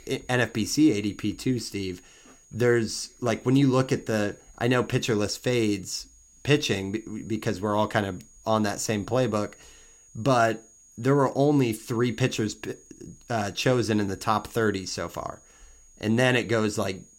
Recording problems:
high-pitched whine; faint; throughout; 6.5 kHz, 25 dB below the speech

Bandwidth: 16 kHz